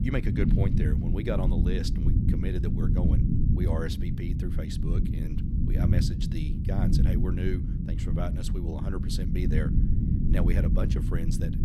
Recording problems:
low rumble; loud; throughout; as loud as the speech

